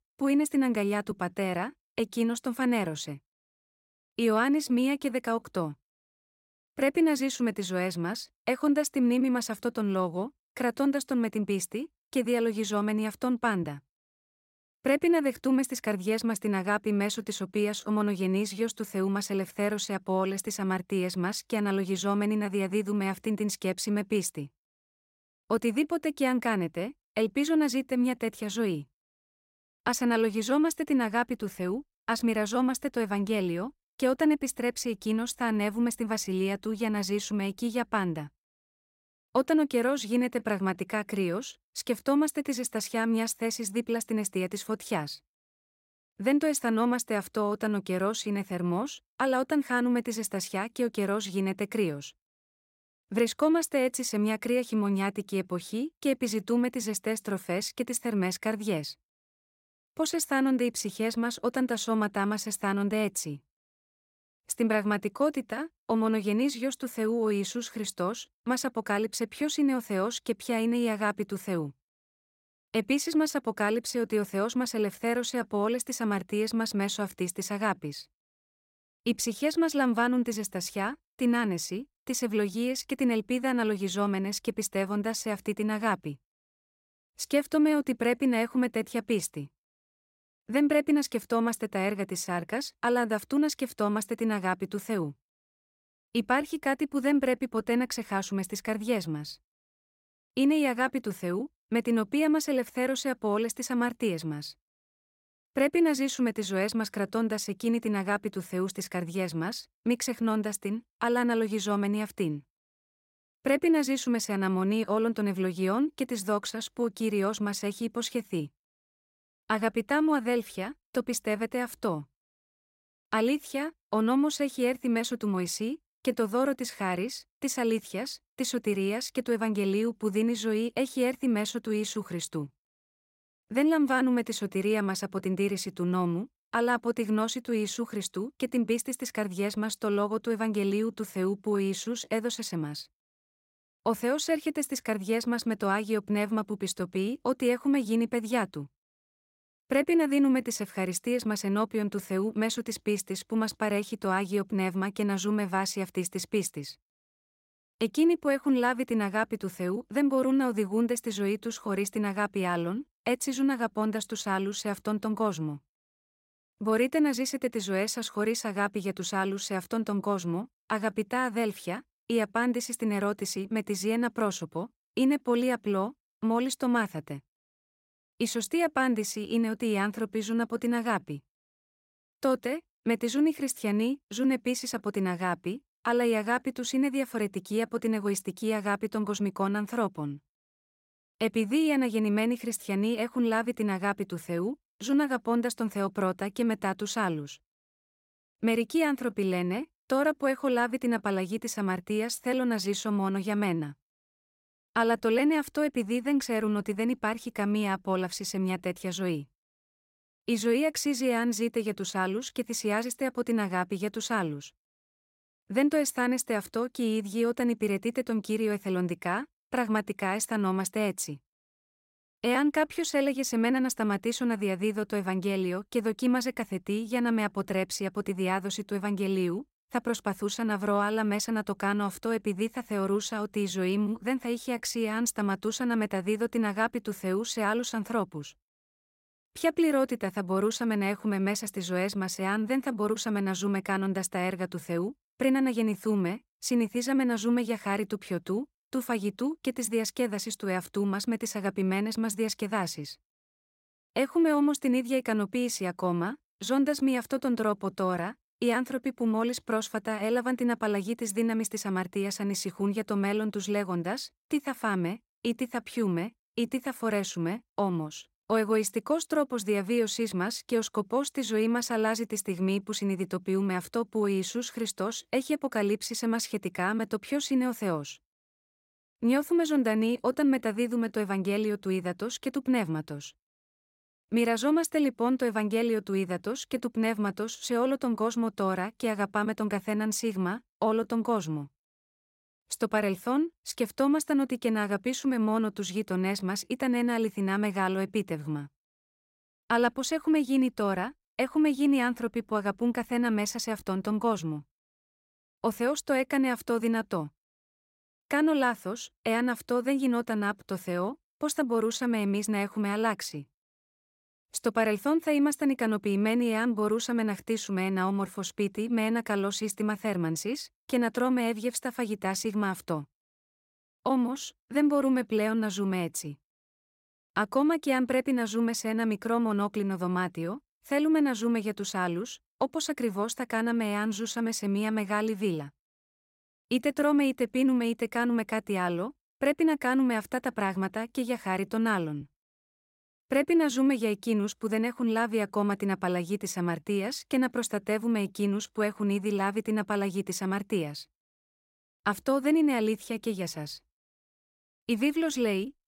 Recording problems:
none

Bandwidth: 16 kHz